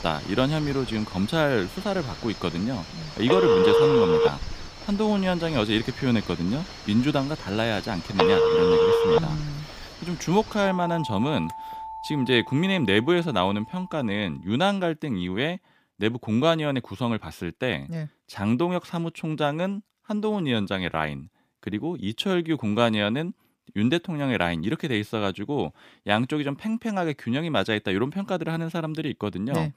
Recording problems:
alarms or sirens; very loud; until 14 s; 3 dB above the speech

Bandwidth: 15 kHz